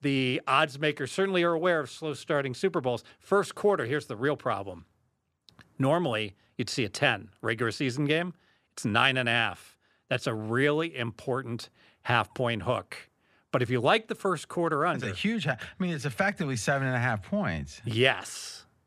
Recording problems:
none

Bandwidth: 14 kHz